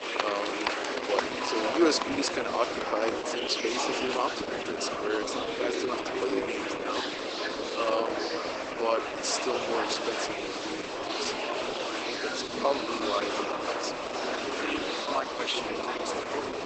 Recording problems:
garbled, watery; badly; nothing above 8 kHz
thin; somewhat; fading below 300 Hz
murmuring crowd; very loud; throughout; 1 dB above the speech

